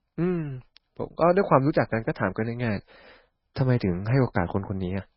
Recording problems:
garbled, watery; badly; nothing above 5.5 kHz

